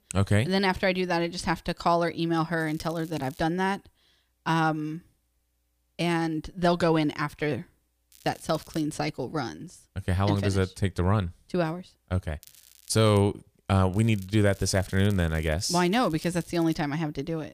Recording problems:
crackling; faint; 4 times, first at 2.5 s; 25 dB below the speech

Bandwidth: 15 kHz